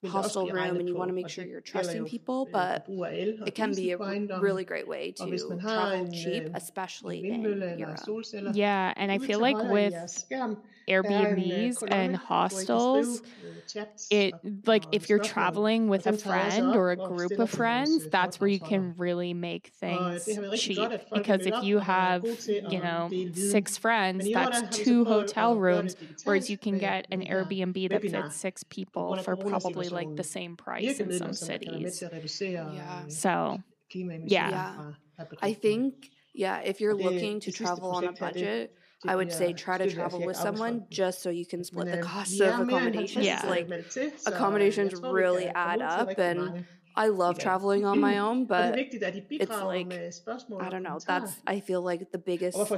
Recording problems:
voice in the background; loud; throughout; 5 dB below the speech

